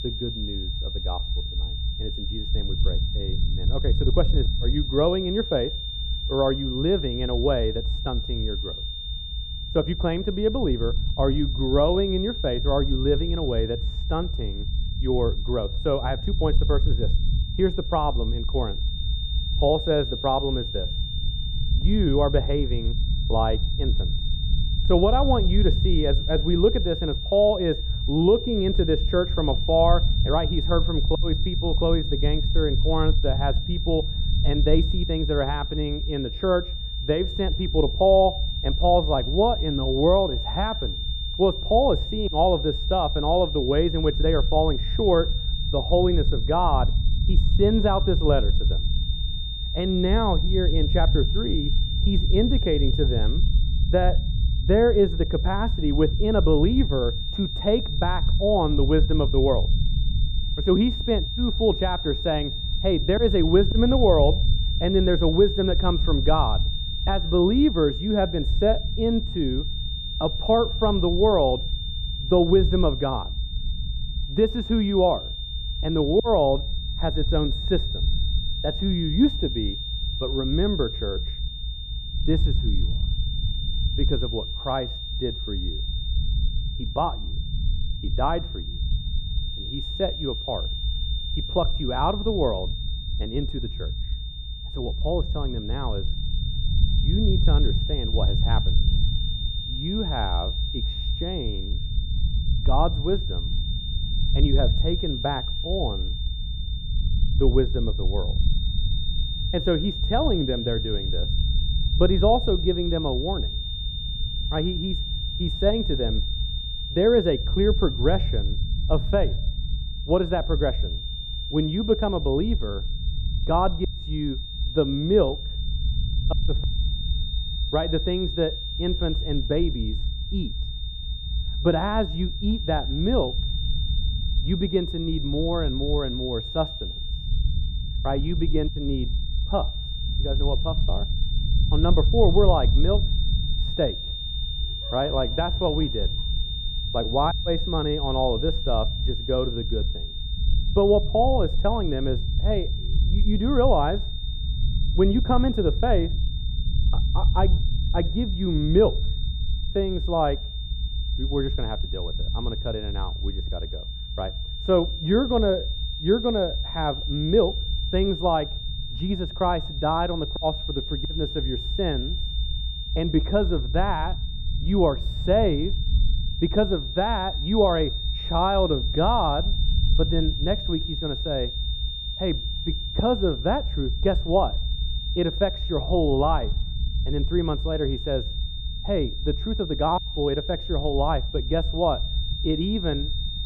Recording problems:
muffled; very; fading above 2 kHz
high-pitched whine; loud; throughout; 3.5 kHz, 8 dB below the speech
low rumble; faint; throughout; 20 dB below the speech

